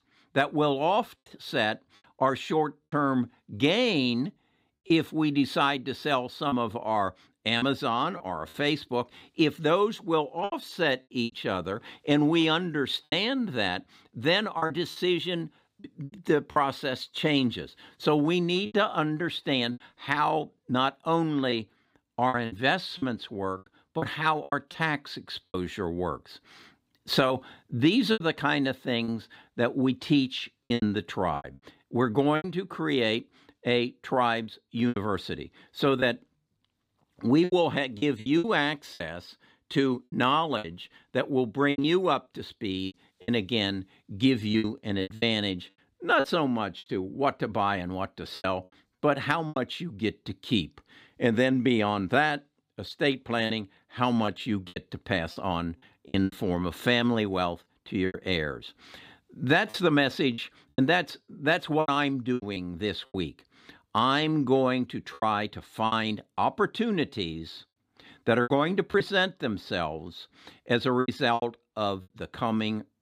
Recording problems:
choppy; very; 8% of the speech affected

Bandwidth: 15.5 kHz